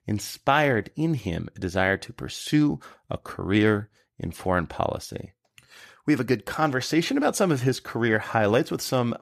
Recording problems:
none

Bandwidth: 14.5 kHz